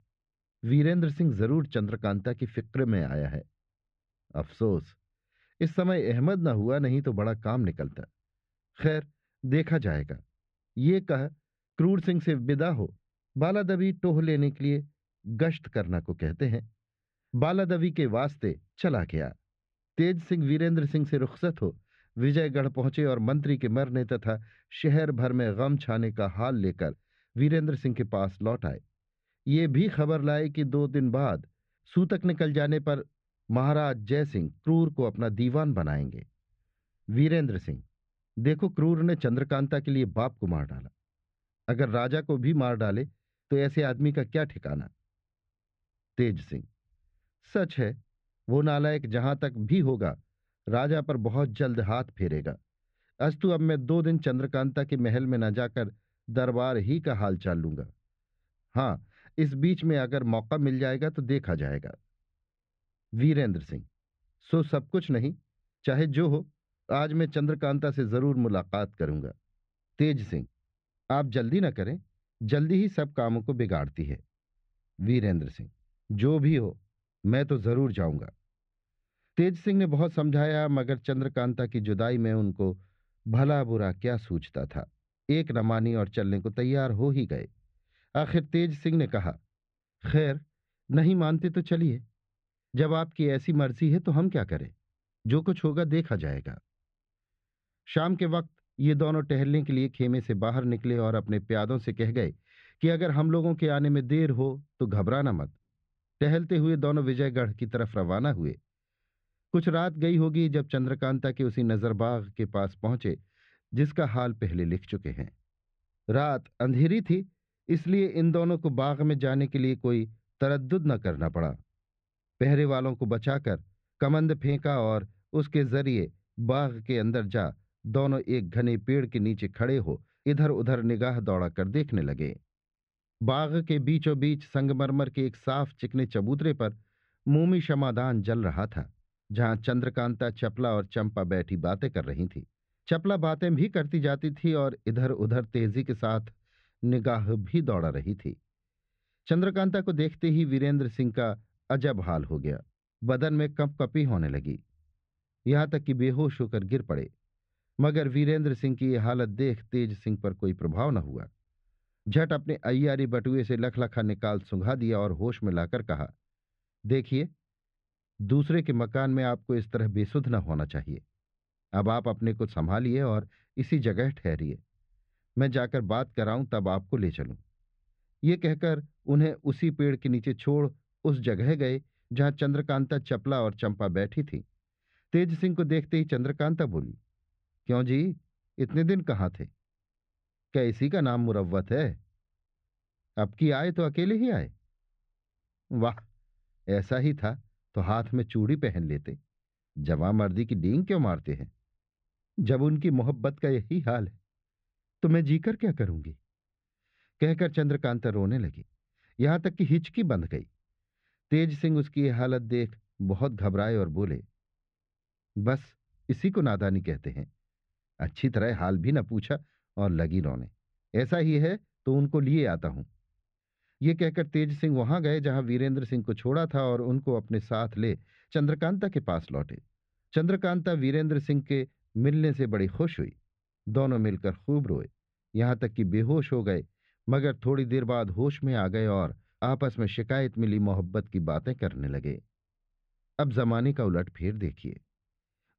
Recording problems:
muffled; very; fading above 2.5 kHz

